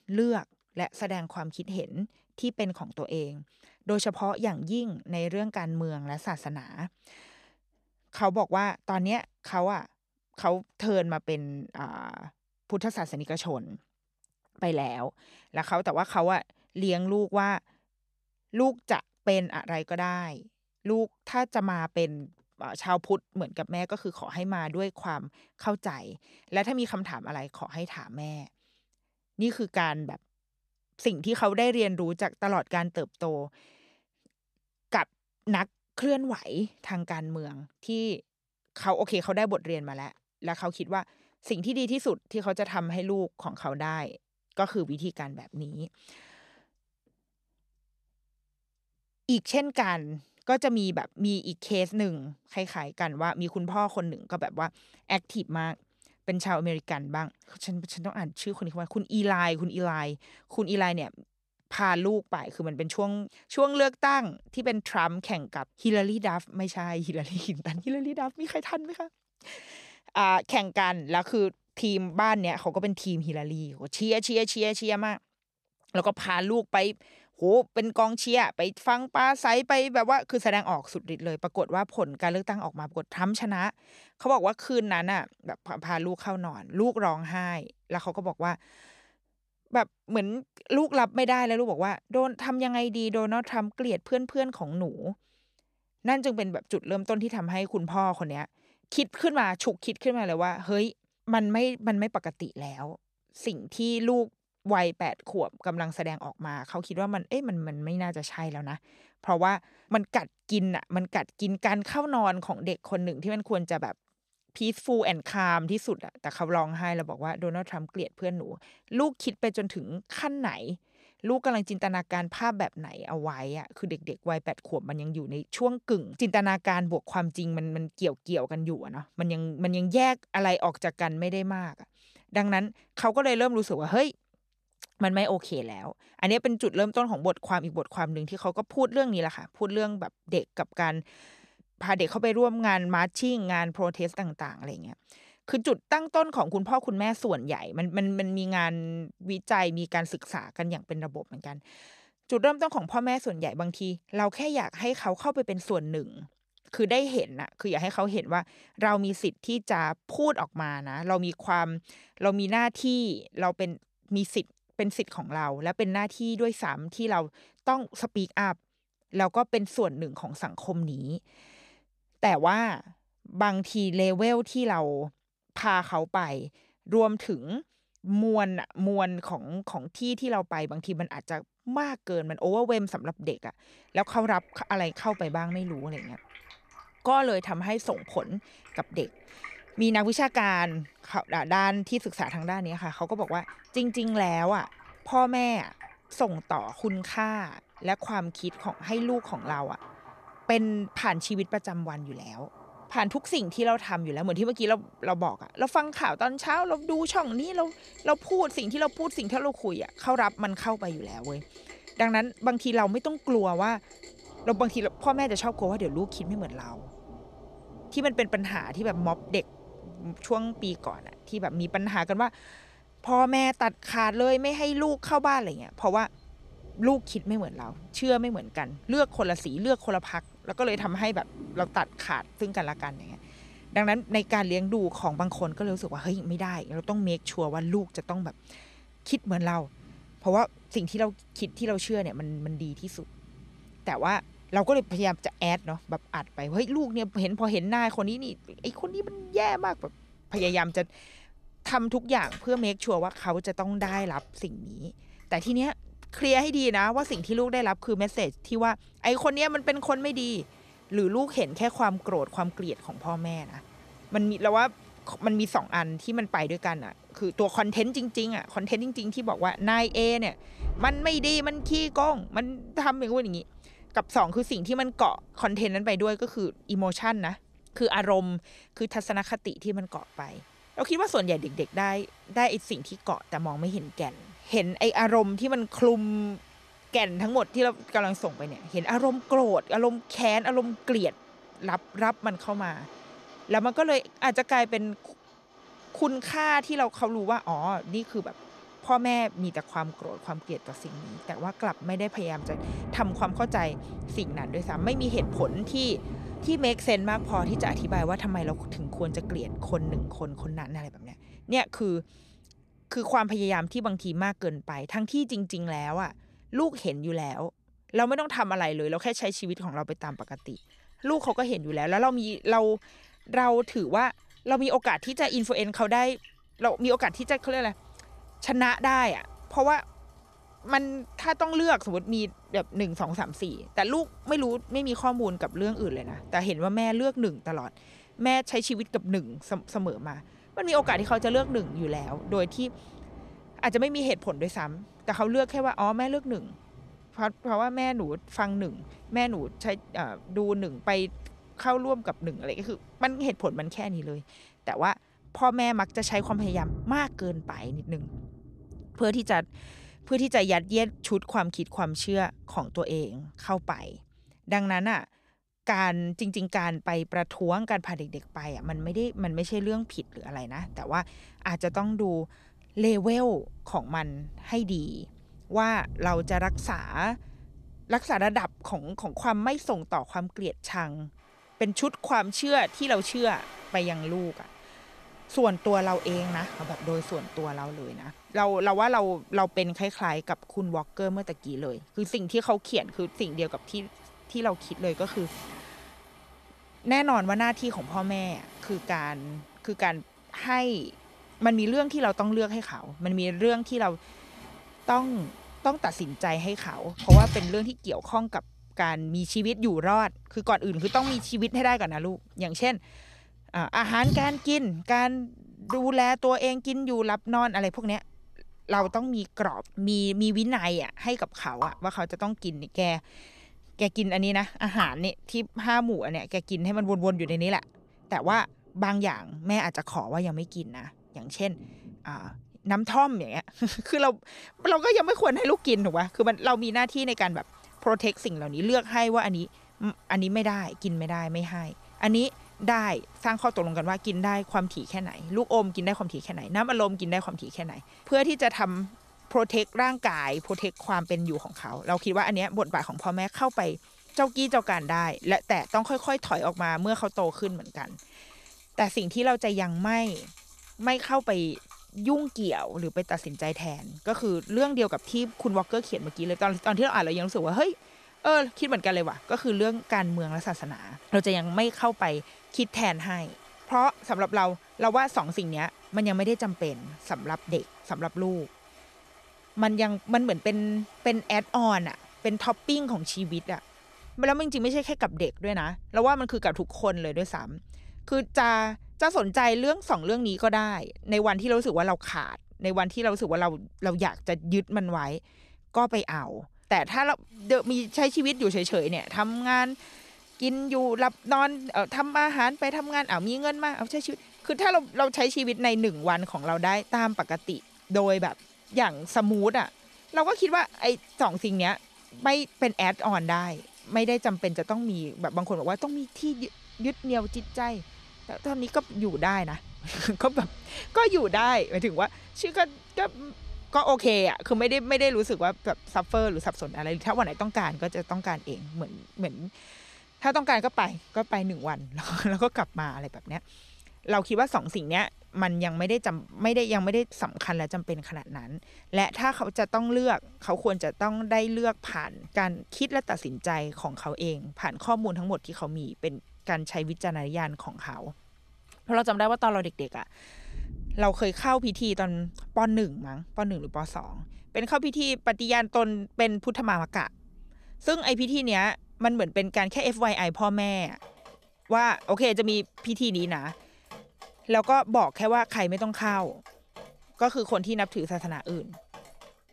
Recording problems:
rain or running water; noticeable; from 3:04 on; 15 dB below the speech

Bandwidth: 14 kHz